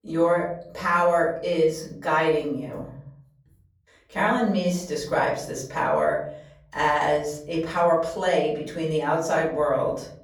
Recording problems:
off-mic speech; far
room echo; slight; dies away in 0.7 s

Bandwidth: 18.5 kHz